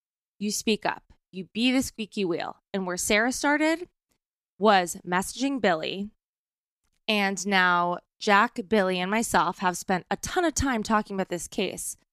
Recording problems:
none

